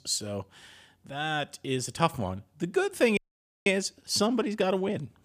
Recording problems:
audio cutting out; at 3 s

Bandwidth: 15 kHz